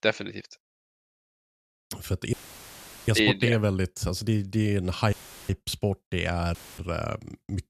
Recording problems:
audio cutting out; filled with static; at 2.5 s for 1 s, at 5 s and at 6.5 s

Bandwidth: 14 kHz